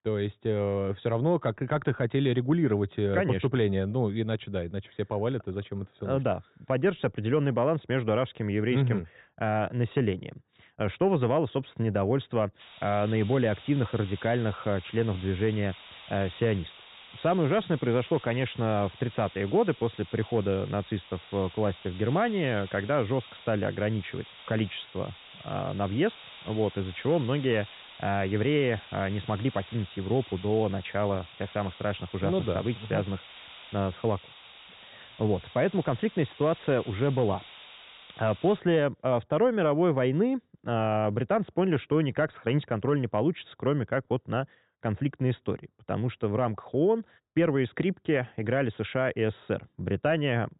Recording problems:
high frequencies cut off; severe; nothing above 4 kHz
hiss; noticeable; from 13 to 39 s; 20 dB below the speech

